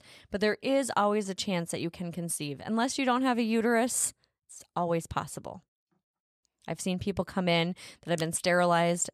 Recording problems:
none

